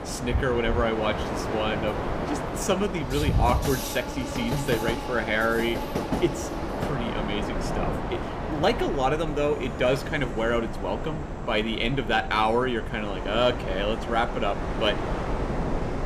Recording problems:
train or aircraft noise; loud; throughout; 5 dB below the speech
wind noise on the microphone; occasional gusts; 15 dB below the speech

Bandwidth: 15 kHz